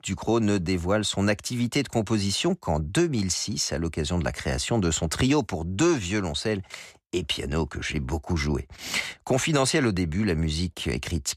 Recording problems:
none

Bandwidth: 14.5 kHz